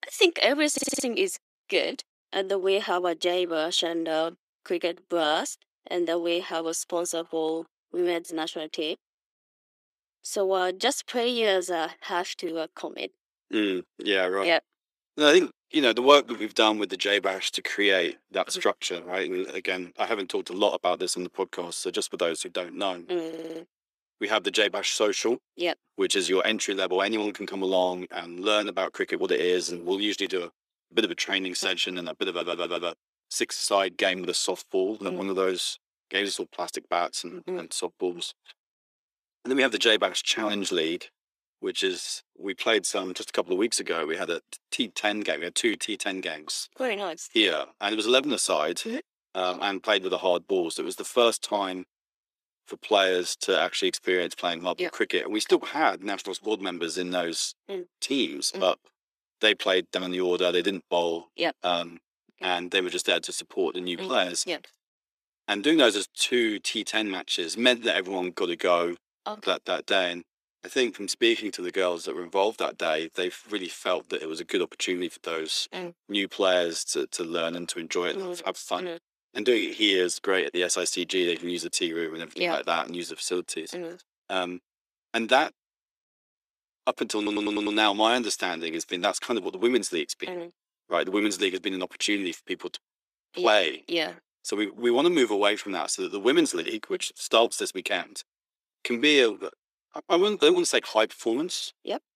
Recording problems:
thin; somewhat; fading below 350 Hz
audio stuttering; 4 times, first at 0.5 s

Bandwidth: 14.5 kHz